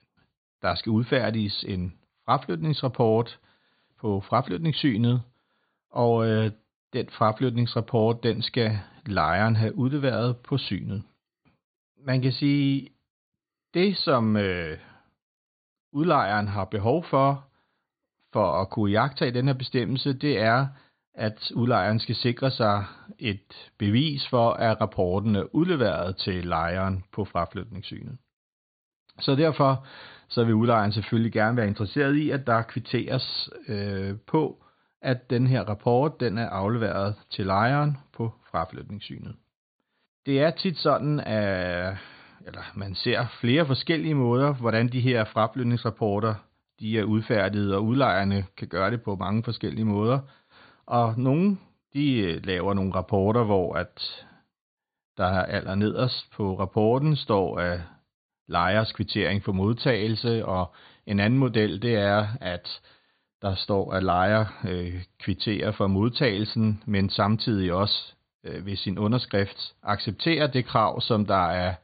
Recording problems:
high frequencies cut off; severe; nothing above 4.5 kHz

